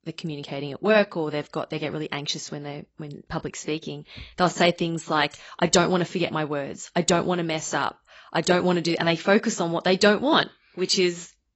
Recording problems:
garbled, watery; badly; nothing above 8 kHz

